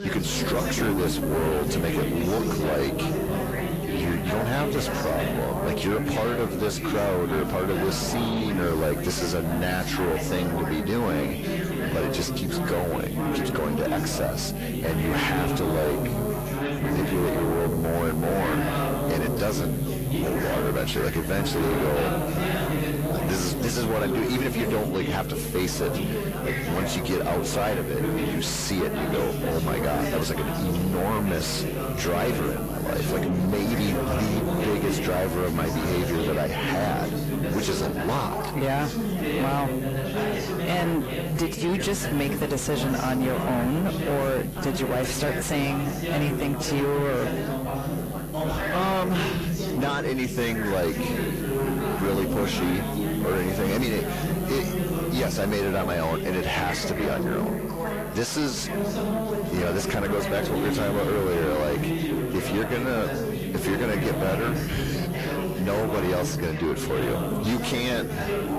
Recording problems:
distortion; heavy; 7 dB below the speech
garbled, watery; slightly
background chatter; loud; throughout; 4 voices, 2 dB below the speech
electrical hum; noticeable; throughout; 60 Hz, 15 dB below the speech

